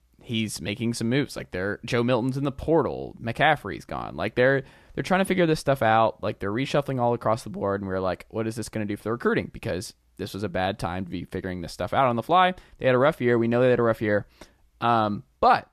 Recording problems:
none

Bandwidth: 14 kHz